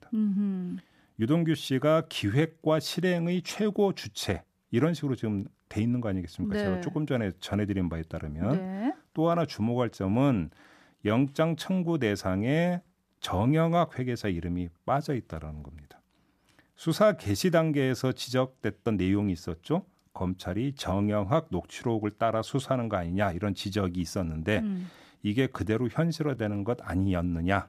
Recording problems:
uneven, jittery; slightly; from 1 to 27 s

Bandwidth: 14.5 kHz